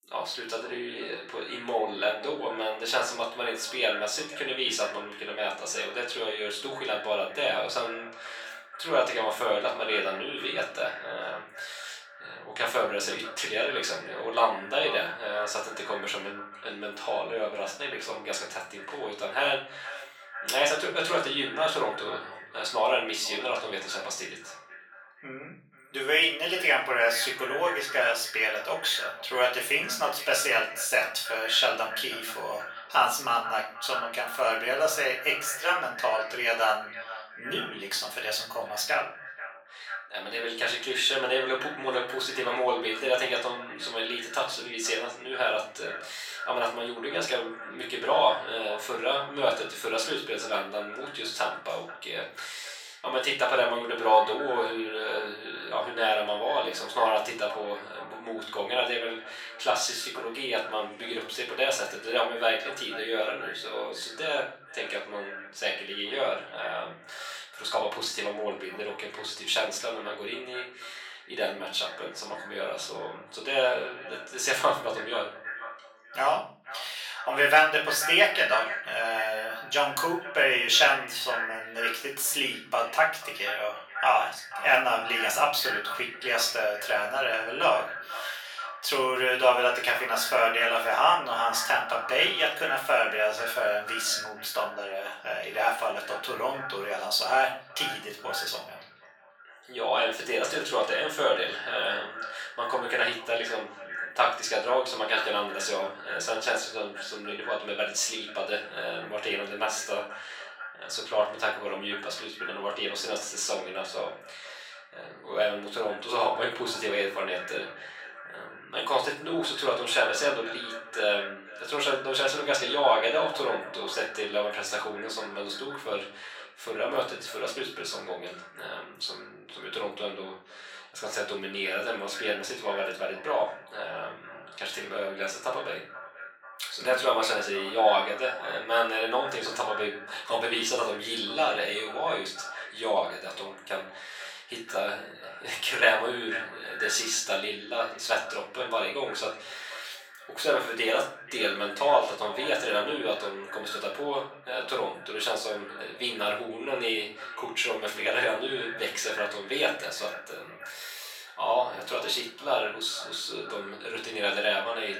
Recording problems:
off-mic speech; far
thin; very; fading below 900 Hz
echo of what is said; noticeable; throughout; 490 ms later, 10 dB below the speech
room echo; slight; dies away in 0.4 s

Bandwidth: 18 kHz